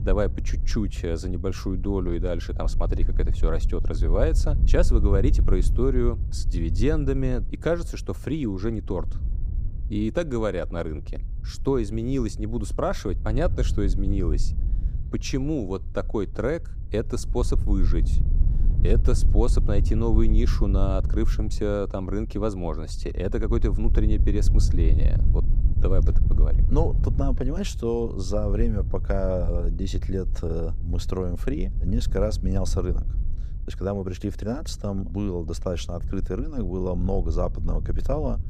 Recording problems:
wind noise on the microphone; occasional gusts; 15 dB below the speech

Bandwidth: 15.5 kHz